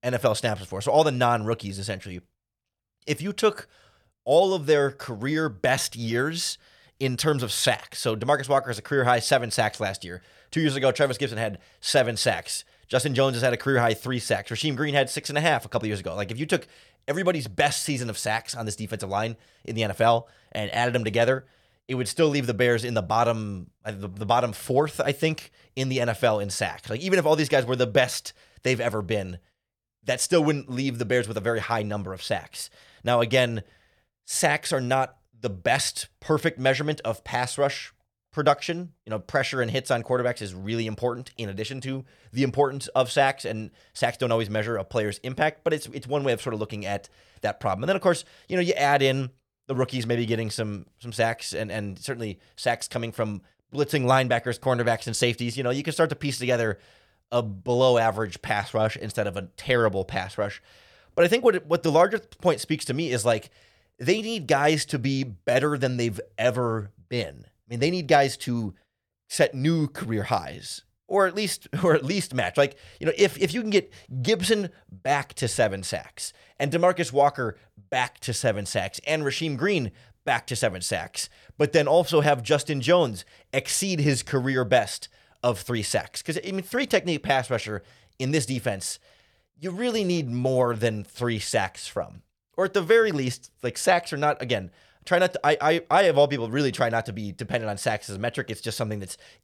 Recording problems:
none

